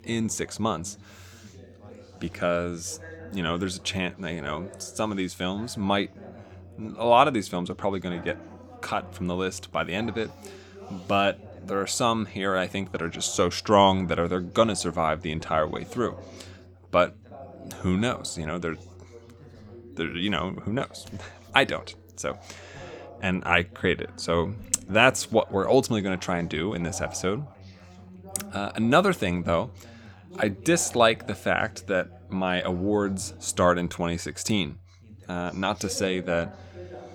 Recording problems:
background chatter; faint; throughout; 2 voices, 20 dB below the speech

